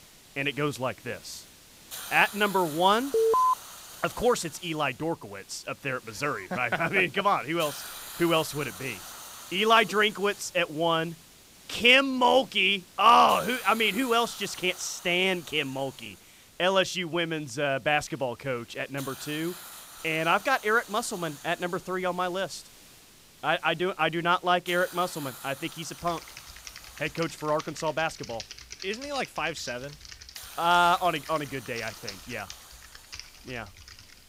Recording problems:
hiss; noticeable; throughout; 20 dB below the speech
alarm; loud; at 3 s; peak 4 dB above the speech
keyboard typing; faint; from 26 s on; peak 15 dB below the speech

